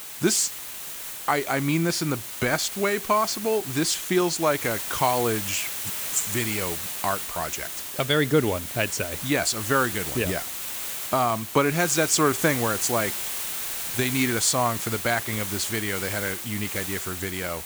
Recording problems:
hiss; loud; throughout; 5 dB below the speech

